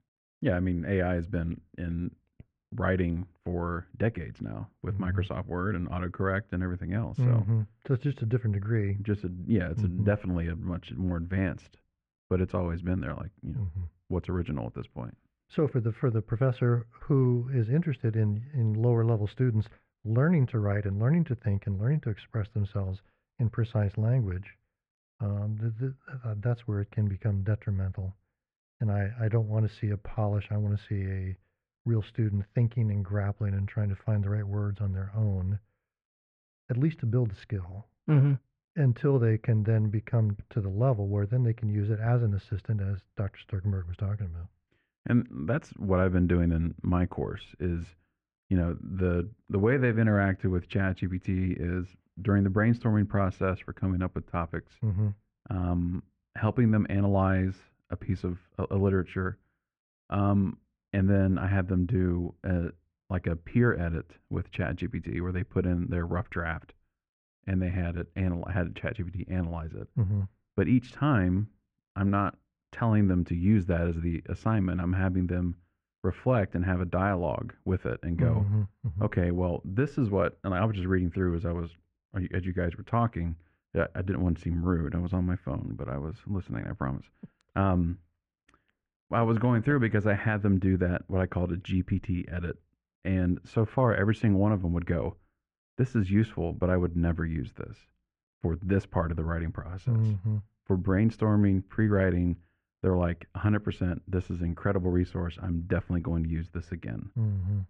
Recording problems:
muffled; very; fading above 1.5 kHz

